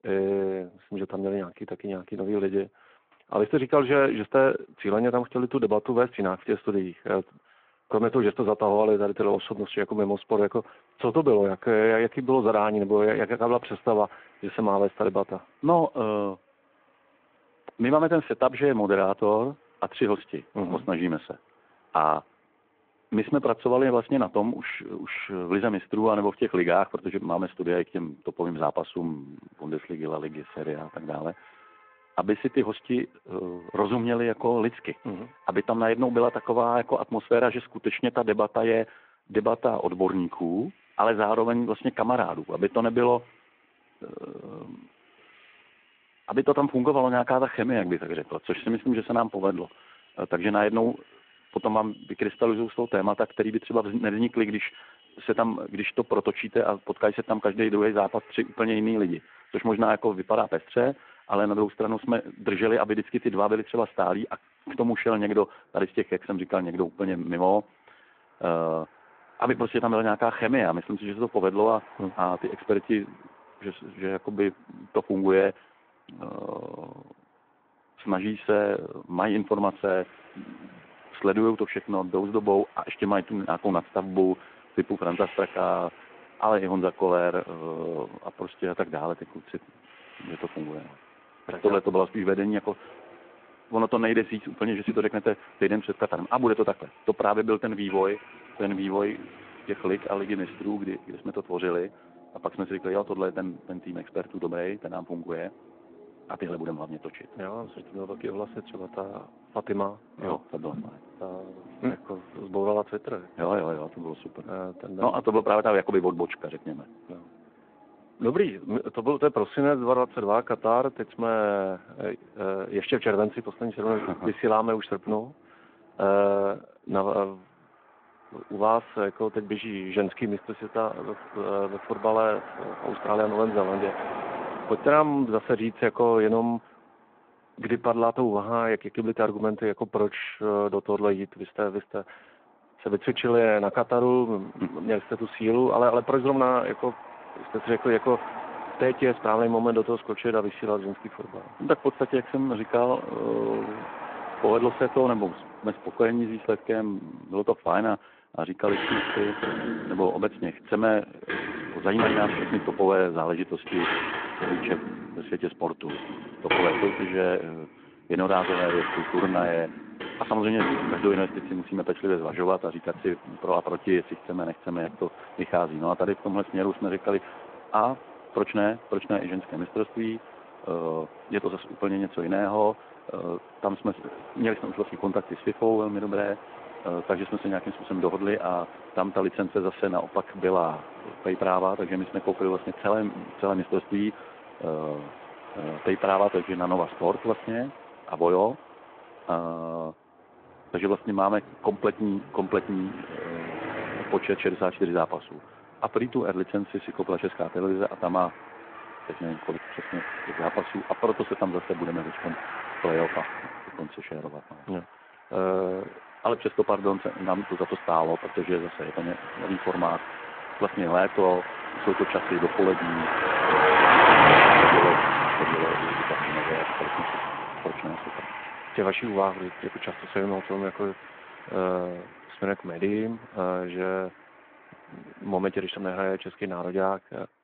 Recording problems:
phone-call audio
traffic noise; loud; throughout; 2 dB below the speech

